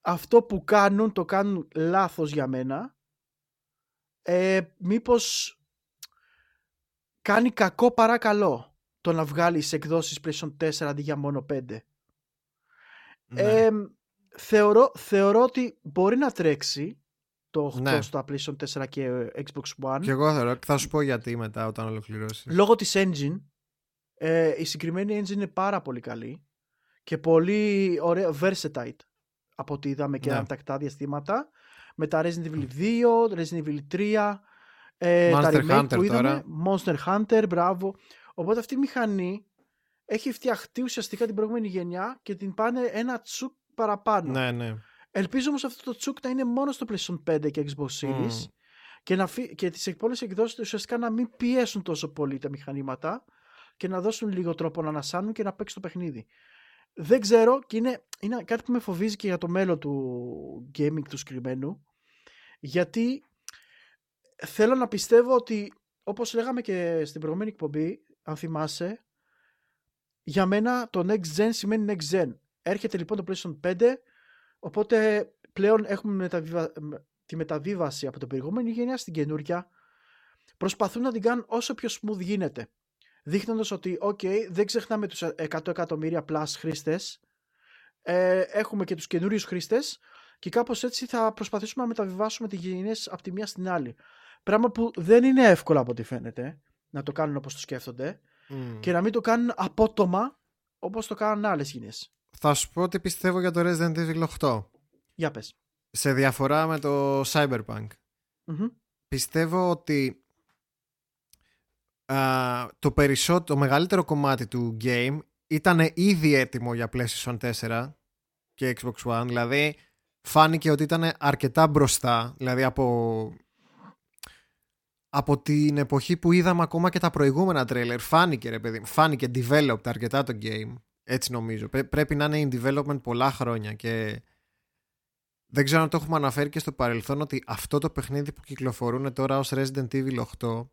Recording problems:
none

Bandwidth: 17.5 kHz